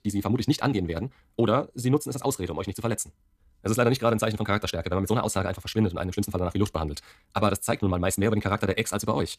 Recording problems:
wrong speed, natural pitch; too fast; 1.7 times normal speed

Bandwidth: 14.5 kHz